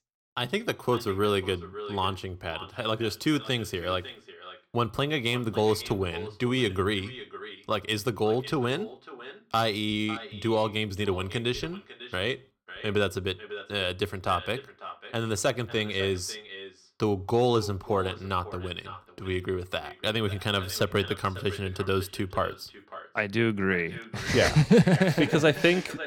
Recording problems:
echo of what is said; noticeable; throughout; 550 ms later, 15 dB below the speech

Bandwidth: 17.5 kHz